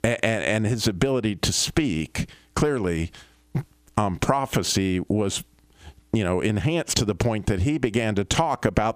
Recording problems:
squashed, flat; heavily

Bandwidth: 15 kHz